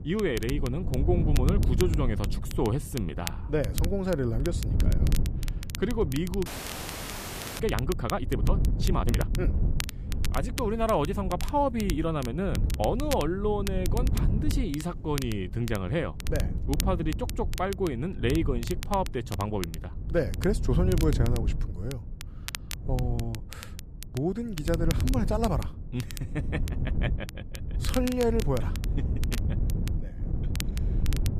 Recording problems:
wind noise on the microphone; occasional gusts; 10 dB below the speech
crackle, like an old record; noticeable; 10 dB below the speech
audio freezing; at 6.5 s for 1 s

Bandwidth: 14.5 kHz